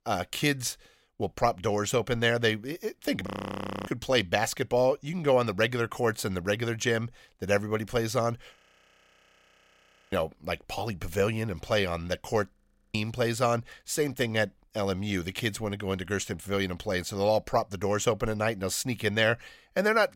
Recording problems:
audio freezing; at 3.5 s for 0.5 s, at 8.5 s for 1.5 s and at 13 s

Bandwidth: 16 kHz